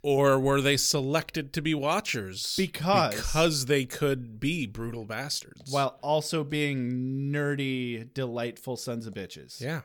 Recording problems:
none

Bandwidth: 18 kHz